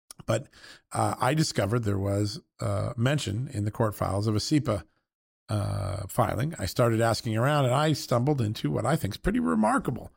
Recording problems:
none

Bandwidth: 16 kHz